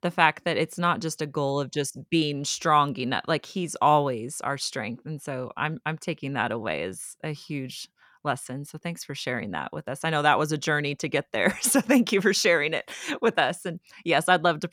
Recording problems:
none

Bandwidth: 17.5 kHz